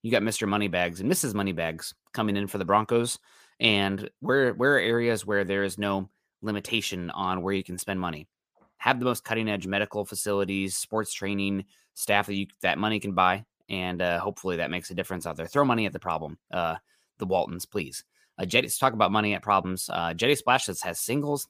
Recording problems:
none

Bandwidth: 15 kHz